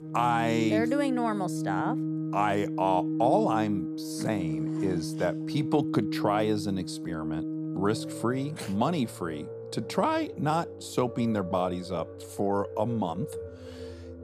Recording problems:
background music; loud; throughout; 5 dB below the speech

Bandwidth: 14.5 kHz